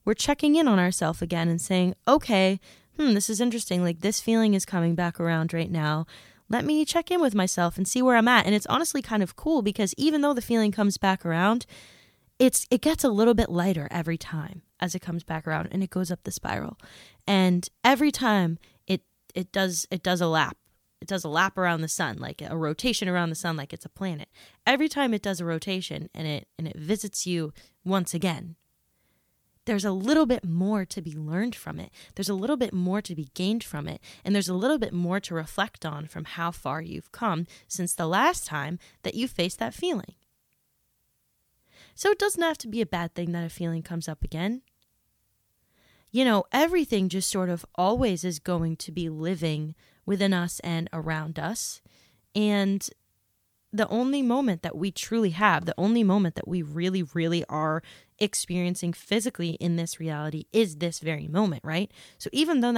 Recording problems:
abrupt cut into speech; at the end

